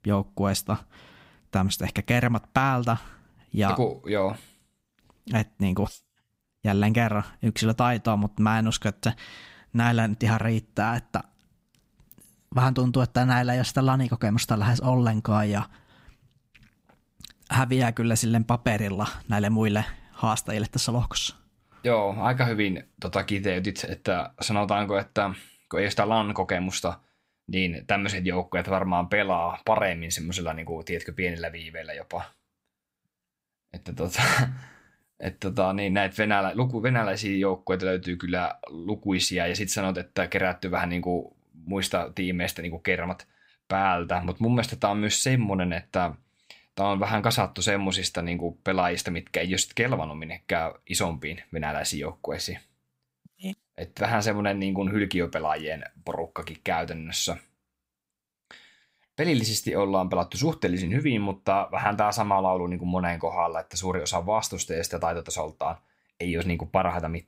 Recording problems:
none

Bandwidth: 15.5 kHz